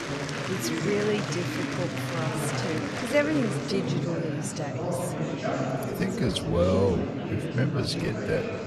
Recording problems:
wrong speed, natural pitch; too slow; 0.7 times normal speed
murmuring crowd; loud; throughout; 1 dB below the speech

